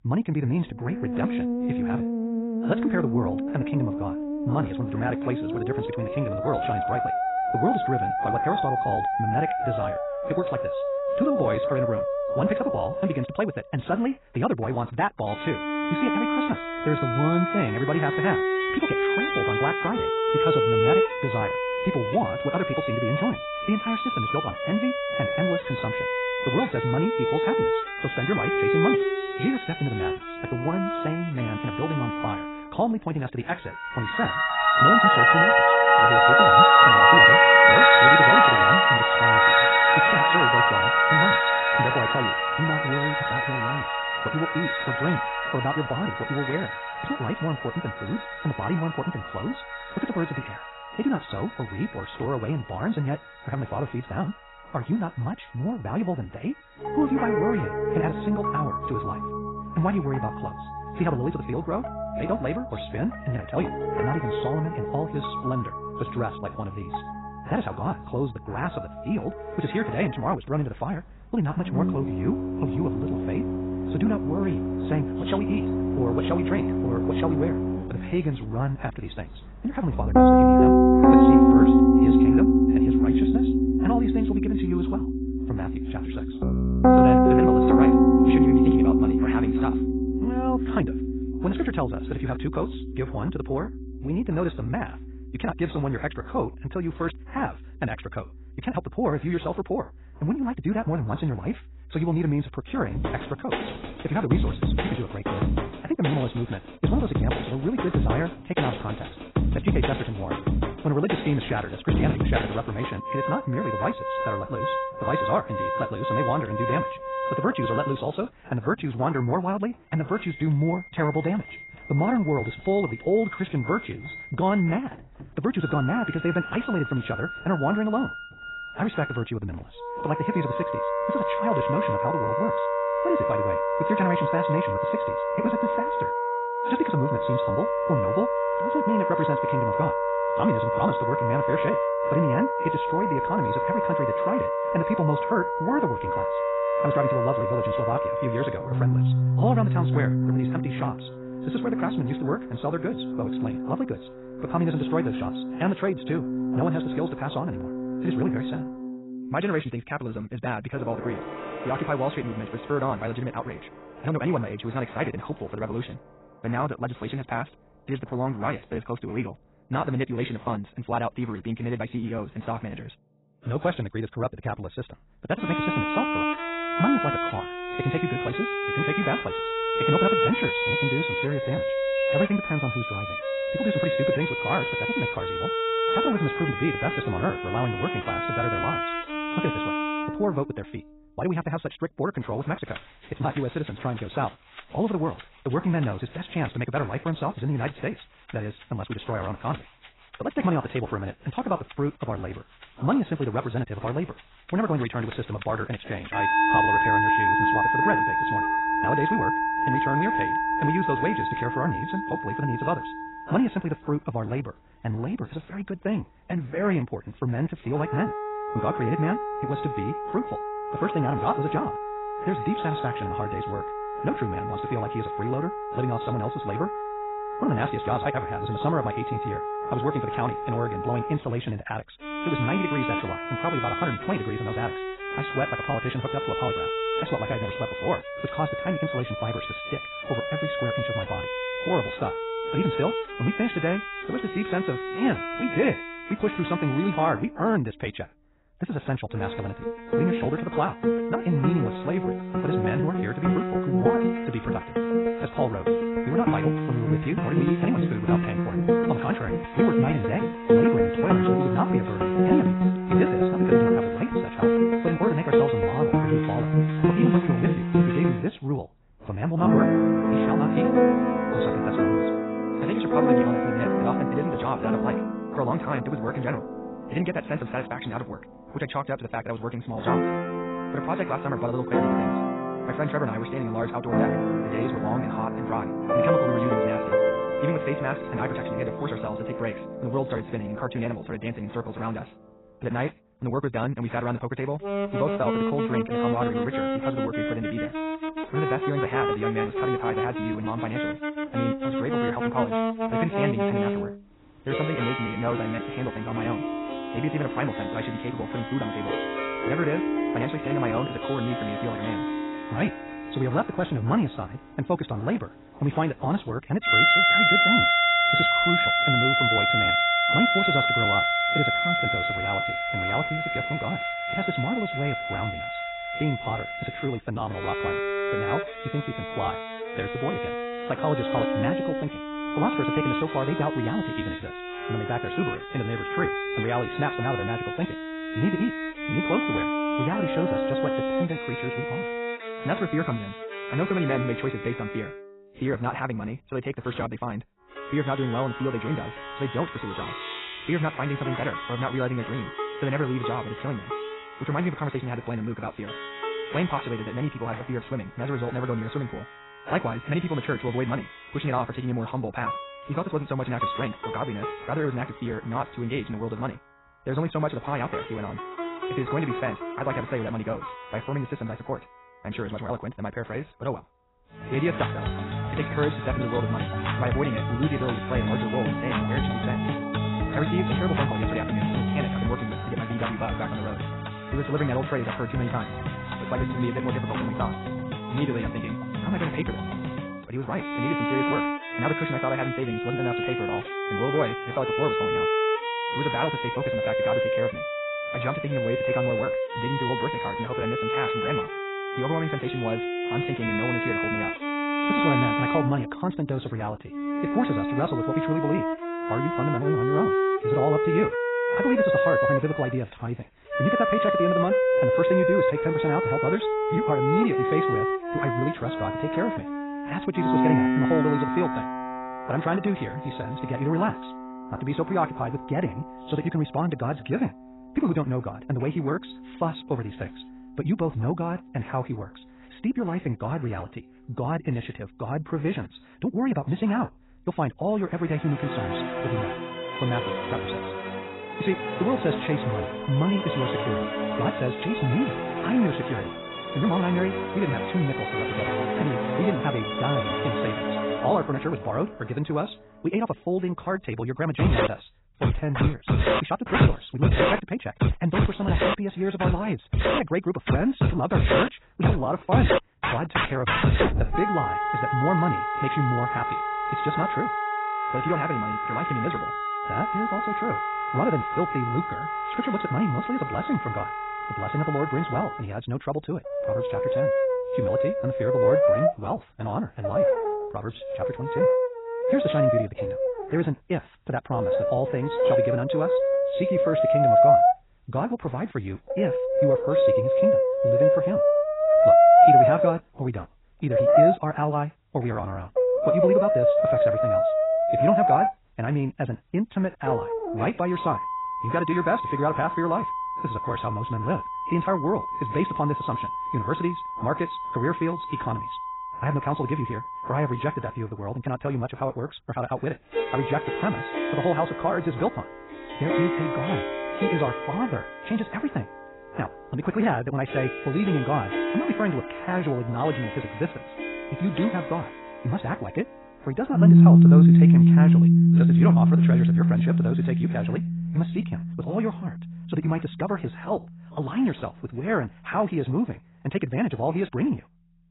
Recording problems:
garbled, watery; badly; nothing above 4 kHz
wrong speed, natural pitch; too fast; 1.8 times normal speed
background music; very loud; throughout; 5 dB above the speech

